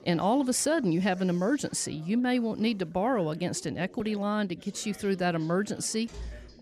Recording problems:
background chatter; faint; throughout; 4 voices, 25 dB below the speech
door banging; faint; at 6 s; peak 15 dB below the speech

